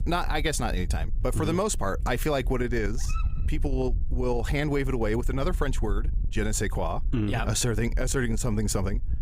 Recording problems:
squashed, flat; somewhat
low rumble; faint; throughout; 20 dB below the speech
dog barking; faint; at 3 s; peak 15 dB below the speech

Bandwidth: 15.5 kHz